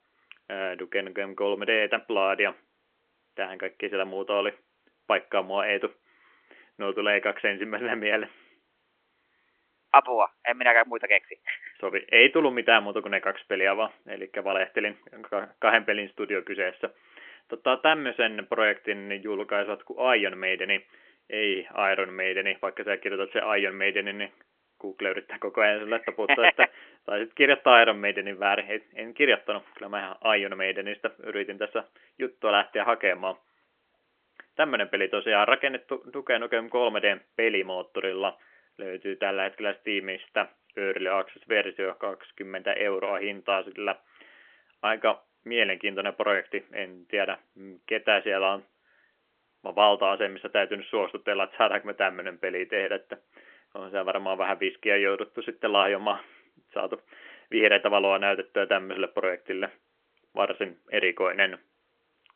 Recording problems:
phone-call audio; nothing above 3 kHz

